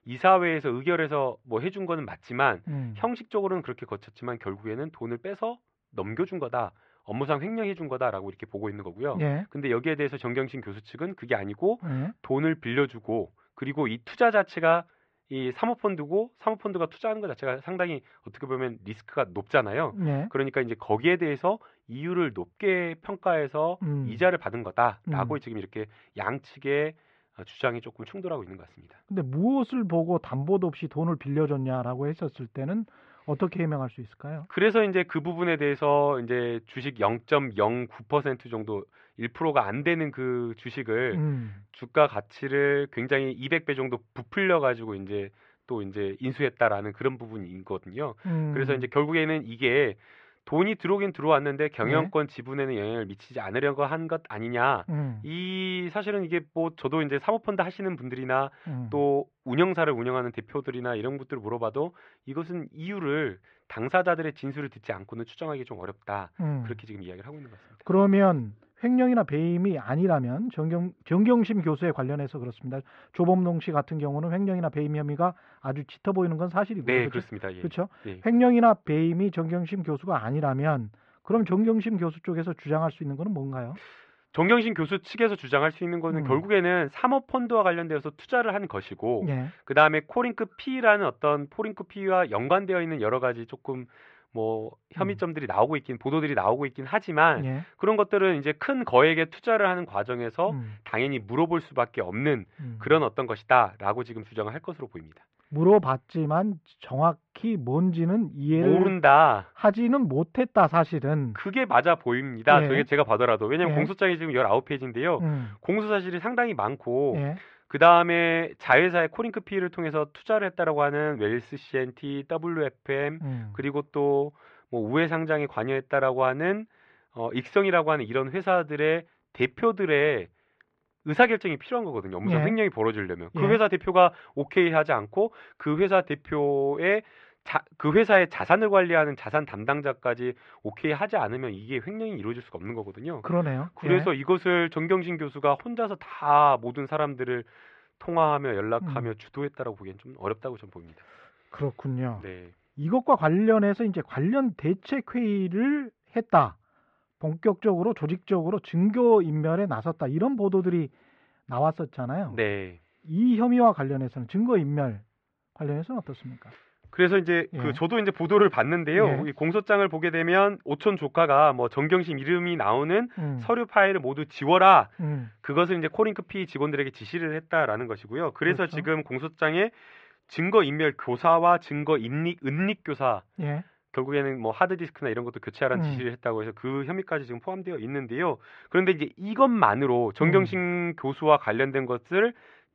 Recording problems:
muffled; very; fading above 2.5 kHz

